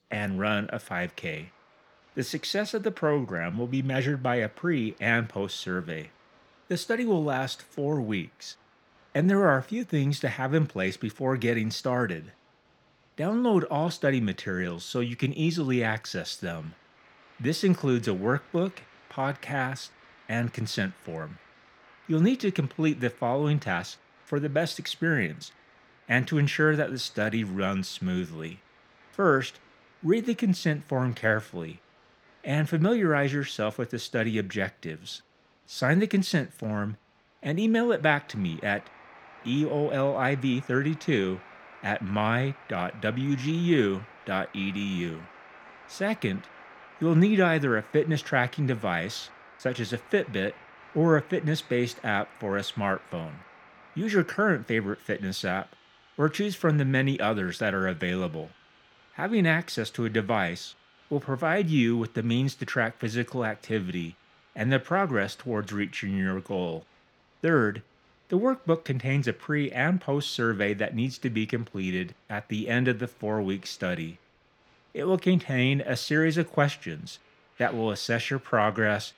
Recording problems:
crowd noise; faint; throughout; 25 dB below the speech

